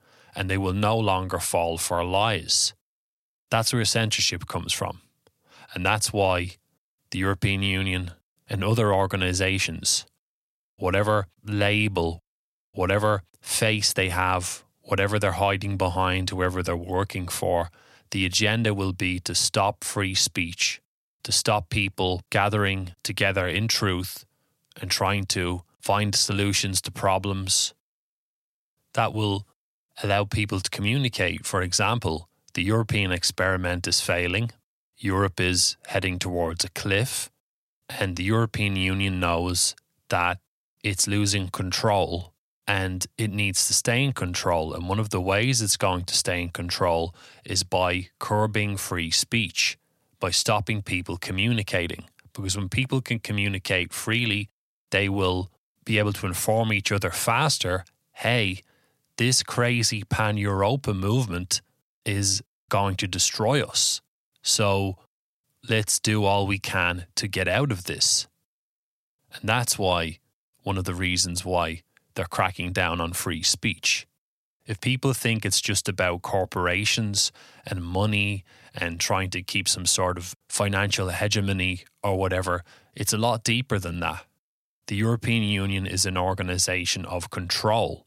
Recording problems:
none

